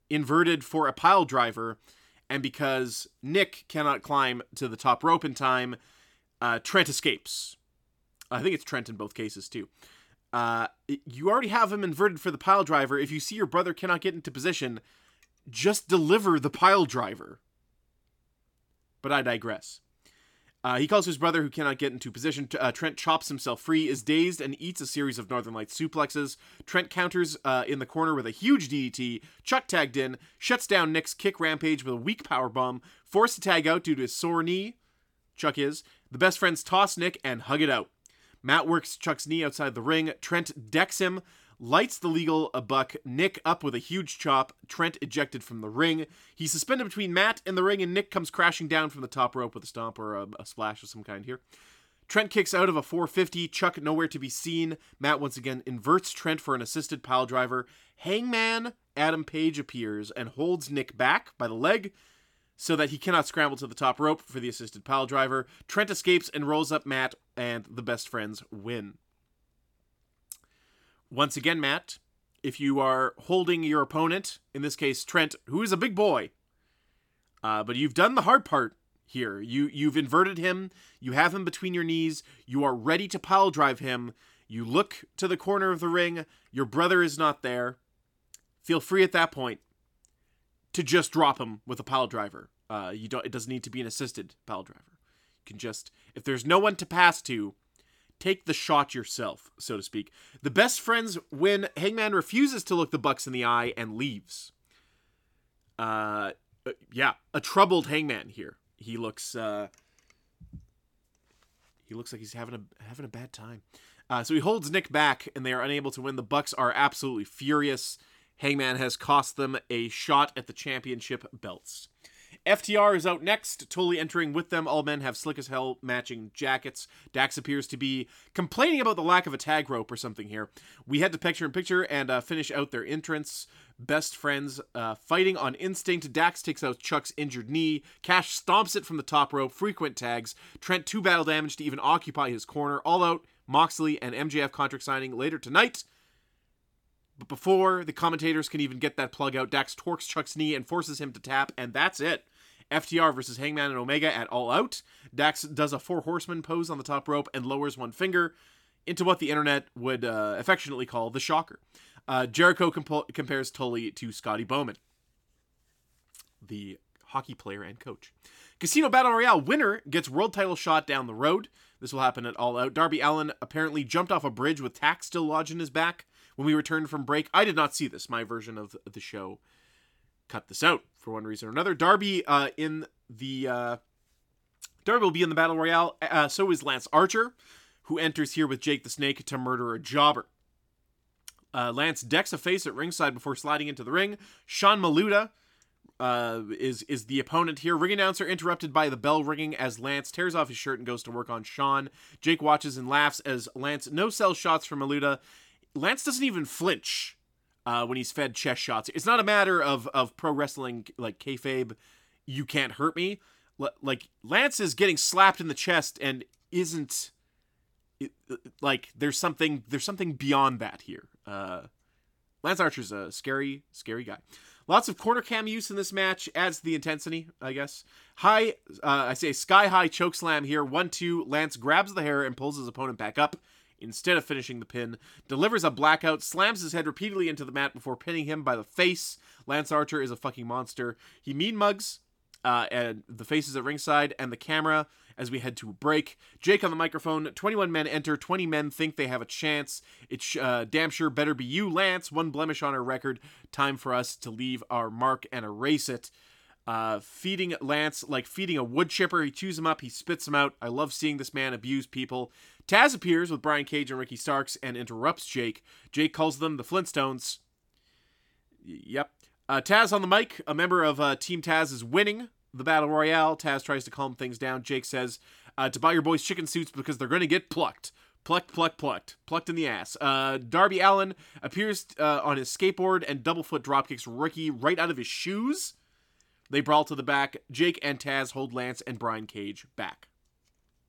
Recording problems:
none

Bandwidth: 17.5 kHz